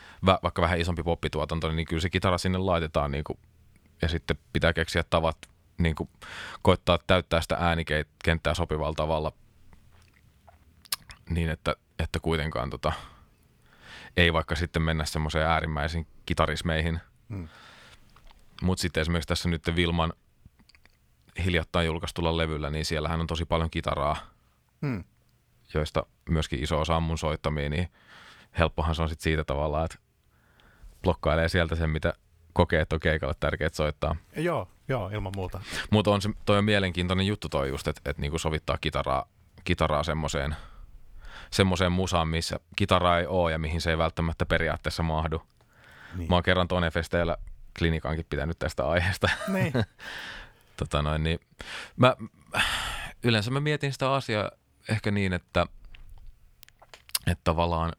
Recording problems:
none

